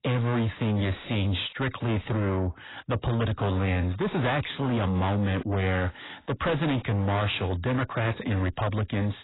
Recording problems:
distortion; heavy; 7 dB below the speech
garbled, watery; badly; nothing above 4 kHz

